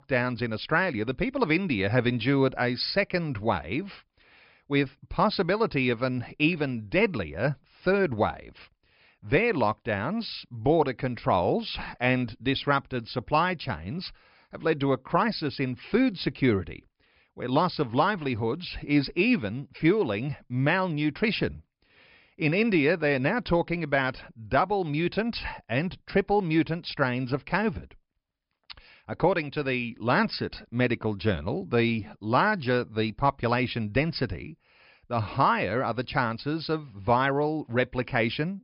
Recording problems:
high frequencies cut off; noticeable; nothing above 5.5 kHz

